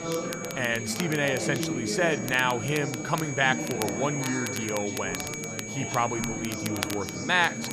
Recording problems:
high-pitched whine; loud; throughout; 2.5 kHz, 8 dB below the speech
chatter from many people; loud; throughout; 6 dB below the speech
crackle, like an old record; noticeable; 10 dB below the speech

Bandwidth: 14.5 kHz